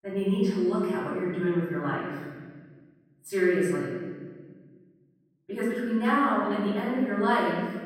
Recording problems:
room echo; strong; dies away in 1.7 s
off-mic speech; far

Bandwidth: 16 kHz